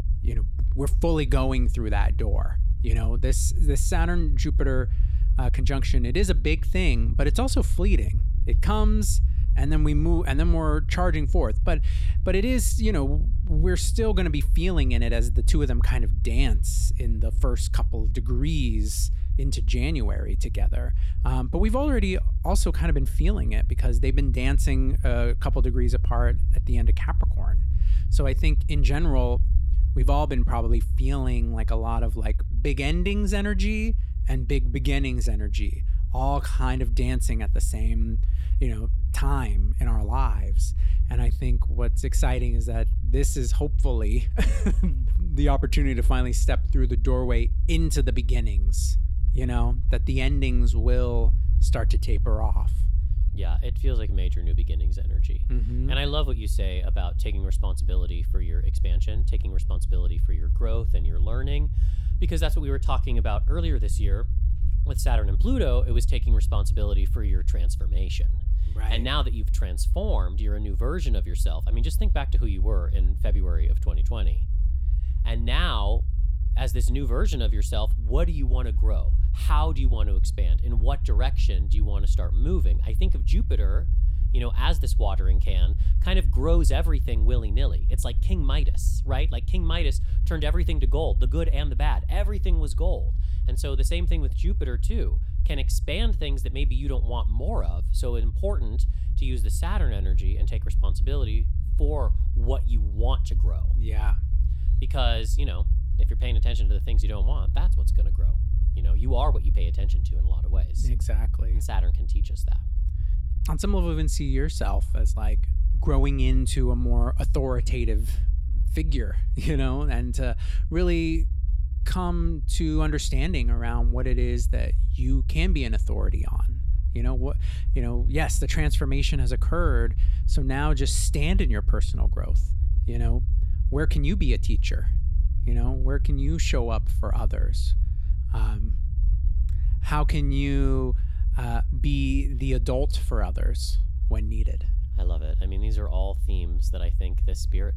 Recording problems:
low rumble; noticeable; throughout; 15 dB below the speech

